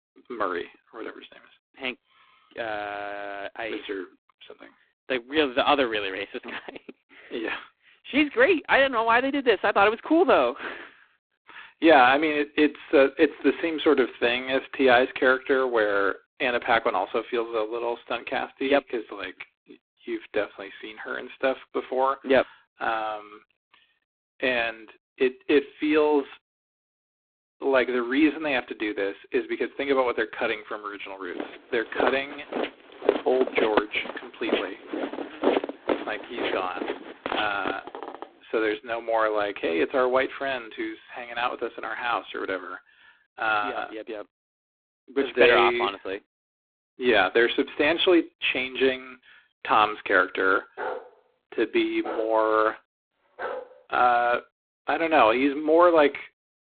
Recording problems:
phone-call audio; poor line
footsteps; noticeable; from 31 to 38 s; peak 1 dB below the speech
dog barking; noticeable; from 51 to 54 s; peak 9 dB below the speech

